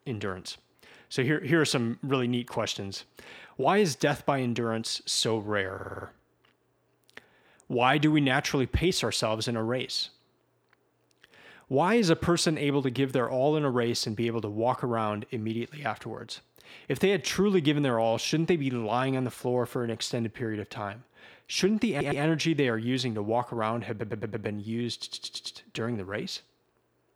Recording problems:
audio stuttering; 4 times, first at 5.5 s

